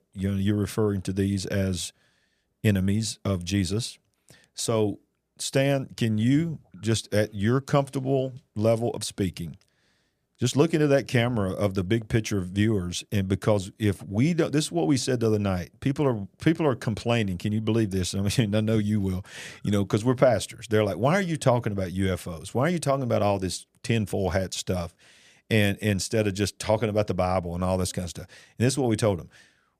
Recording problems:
none

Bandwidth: 15 kHz